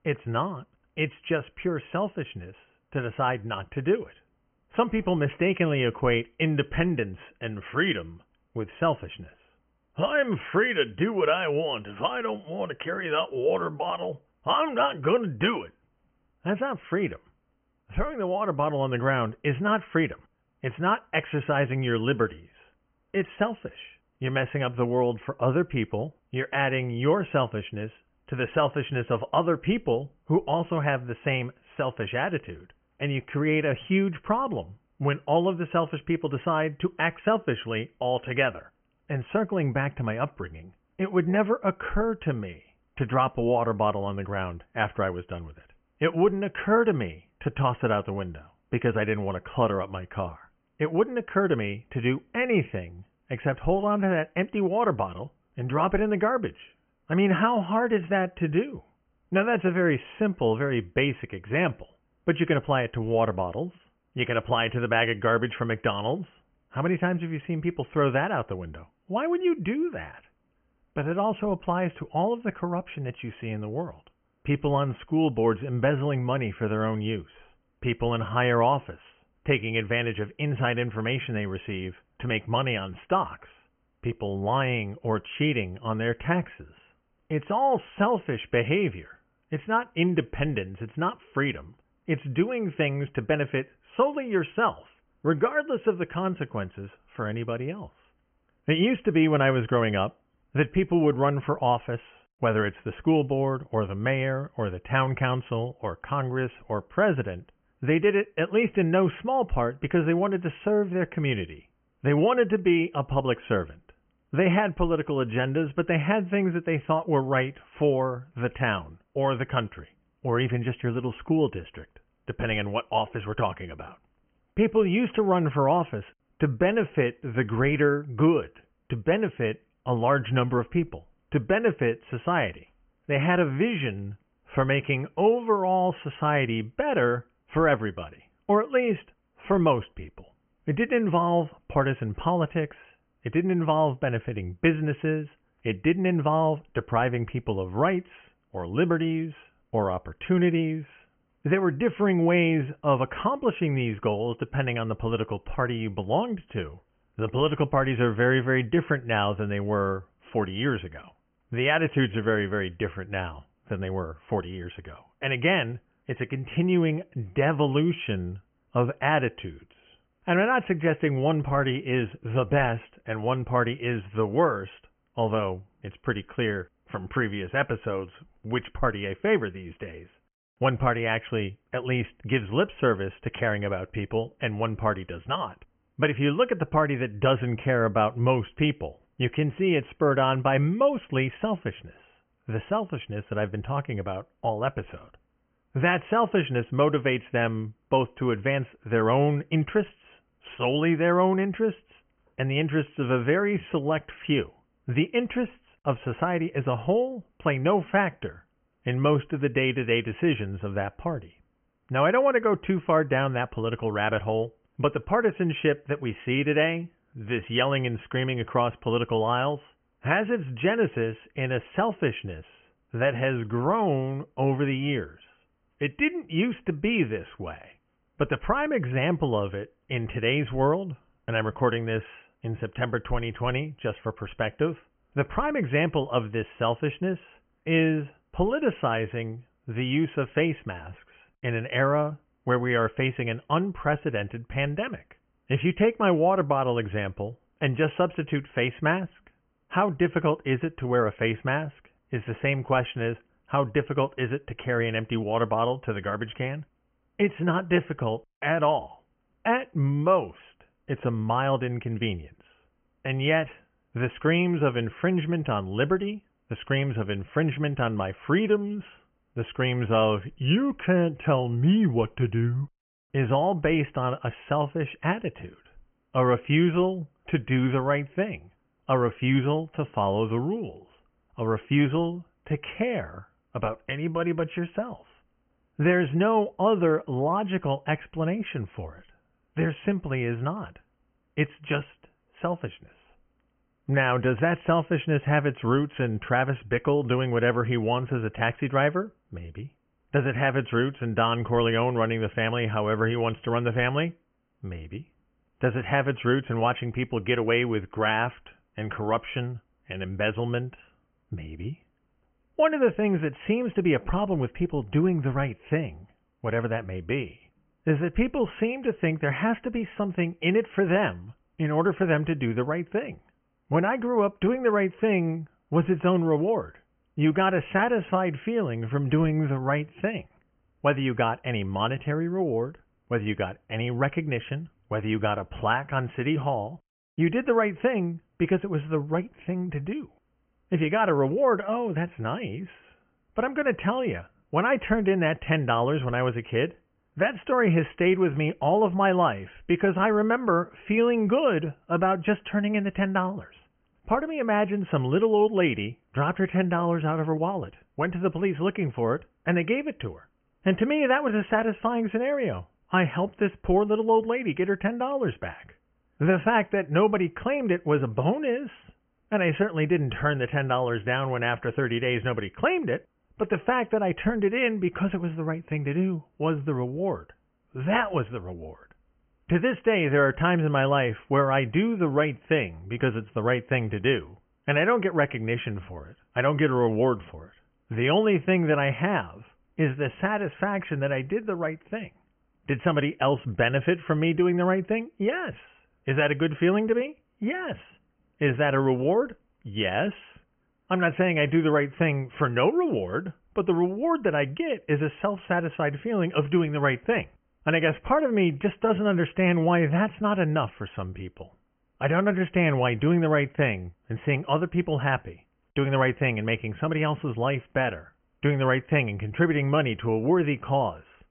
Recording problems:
high frequencies cut off; severe; nothing above 3 kHz

